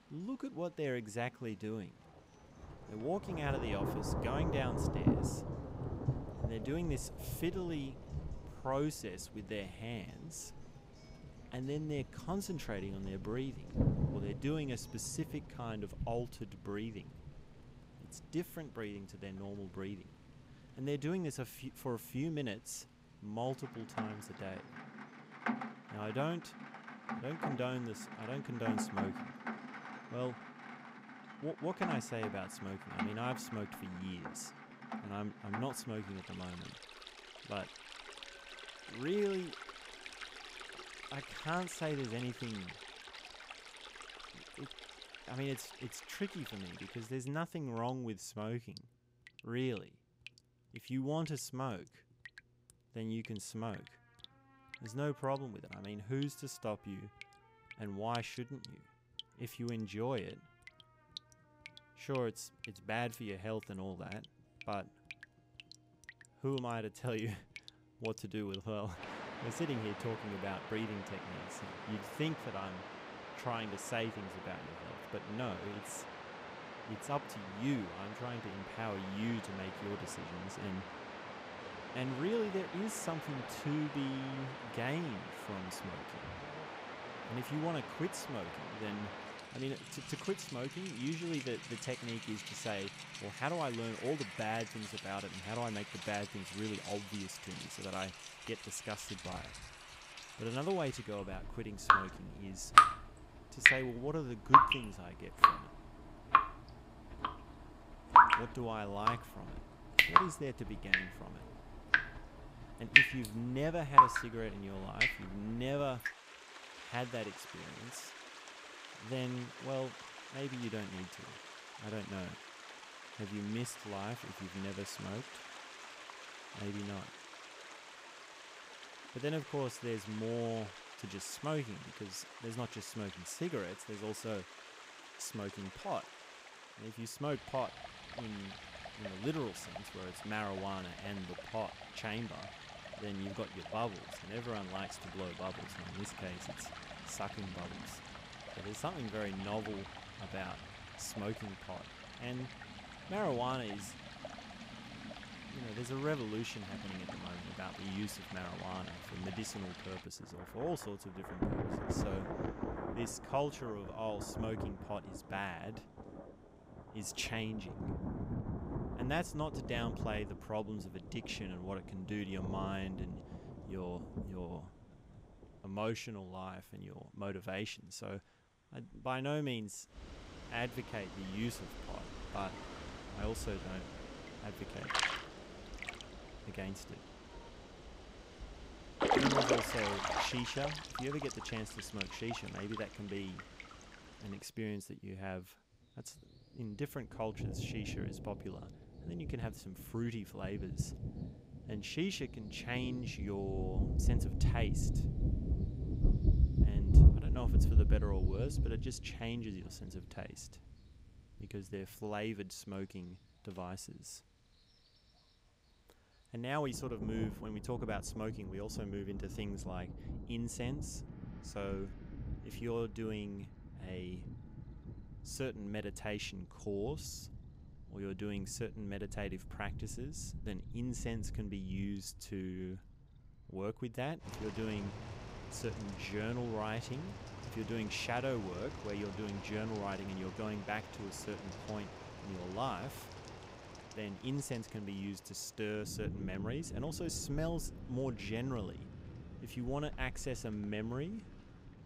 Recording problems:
rain or running water; very loud; throughout; 3 dB above the speech
background music; faint; throughout; 25 dB below the speech

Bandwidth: 15.5 kHz